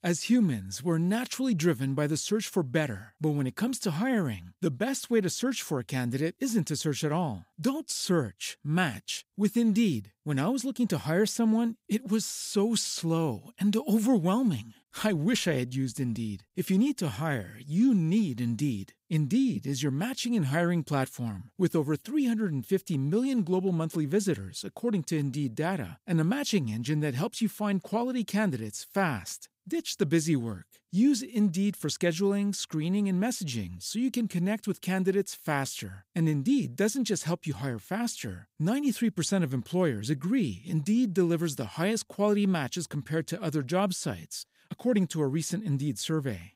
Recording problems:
none

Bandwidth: 15.5 kHz